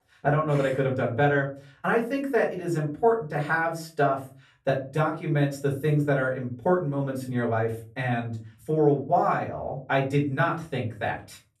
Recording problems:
off-mic speech; far
room echo; slight; dies away in 0.3 s

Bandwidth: 13.5 kHz